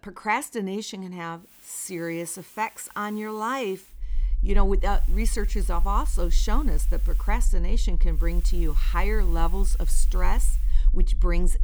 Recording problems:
hiss; noticeable; from 1.5 to 4 s, from 5 to 7.5 s and from 8 to 11 s; 15 dB below the speech
low rumble; faint; from 4 s on; 20 dB below the speech

